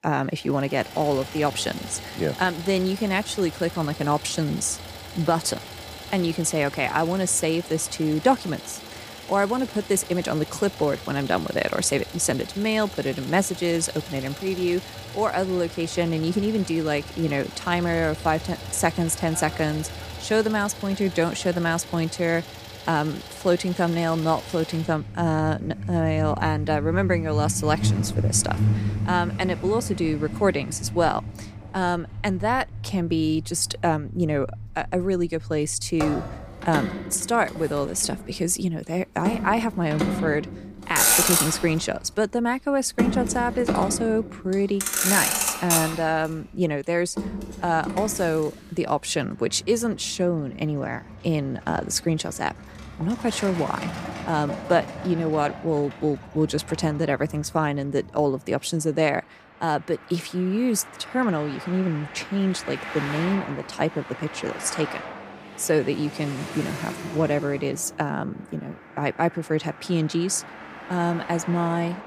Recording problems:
traffic noise; loud; throughout; 6 dB below the speech

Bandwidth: 15 kHz